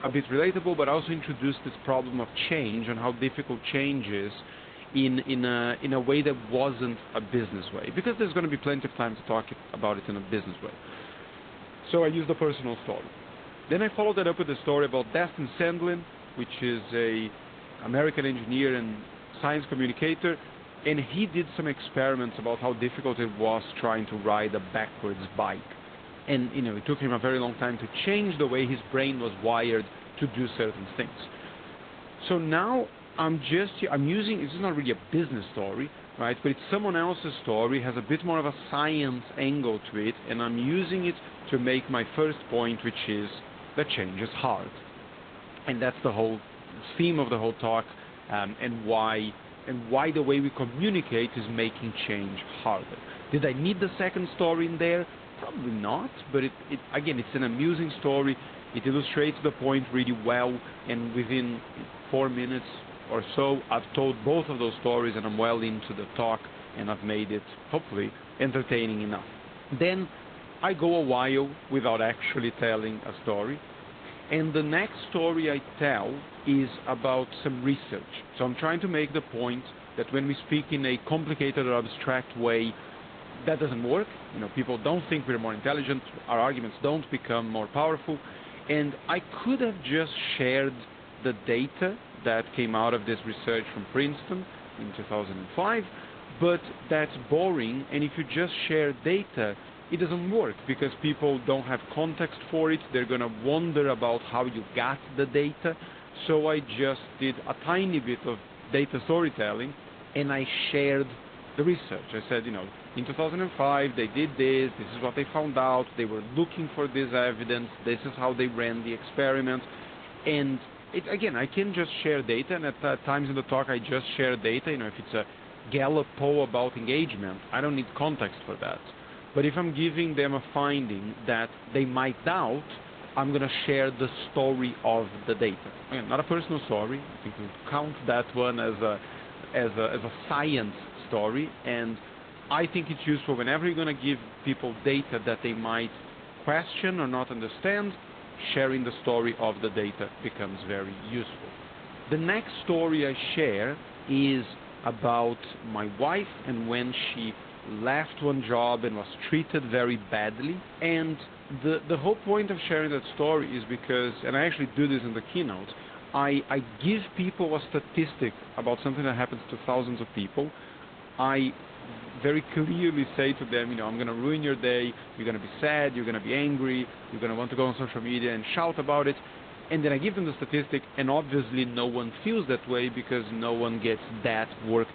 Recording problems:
high frequencies cut off; severe; nothing above 4 kHz
garbled, watery; slightly
hiss; noticeable; throughout; 15 dB below the speech

